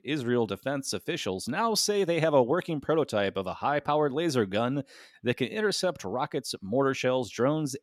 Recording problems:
none

